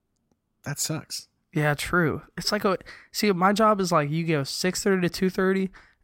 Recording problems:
none

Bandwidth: 16 kHz